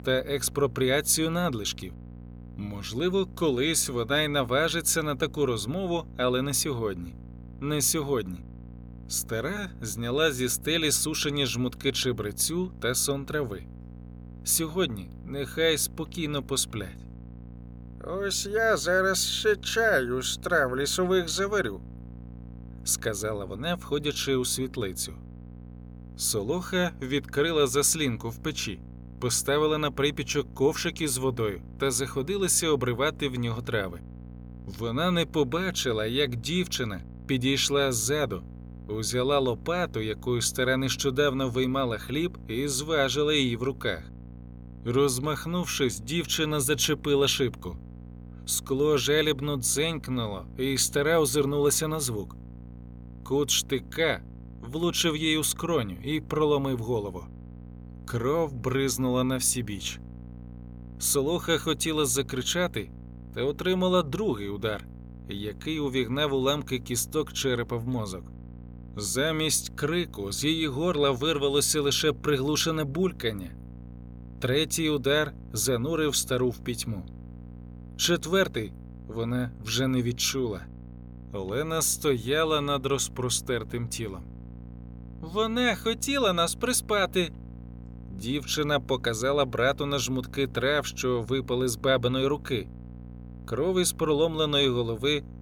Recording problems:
electrical hum; faint; throughout; 60 Hz, 25 dB below the speech

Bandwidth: 18 kHz